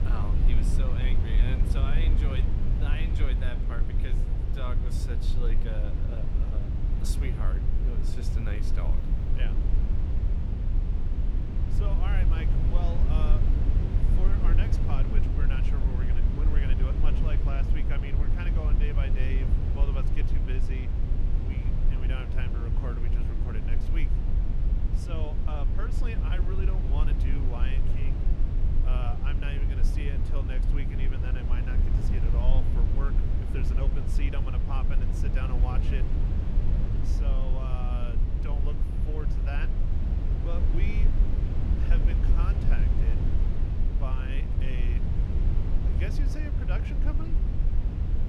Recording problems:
low rumble; loud; throughout; 1 dB below the speech

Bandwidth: 18.5 kHz